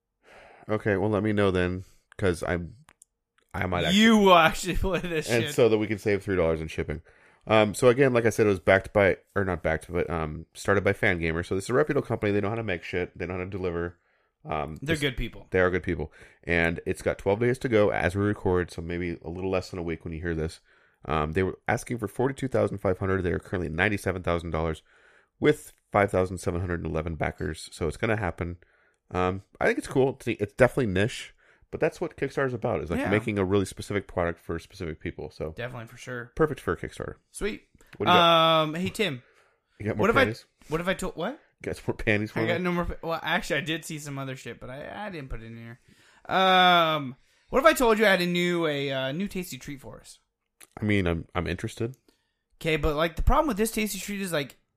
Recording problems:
none

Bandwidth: 14.5 kHz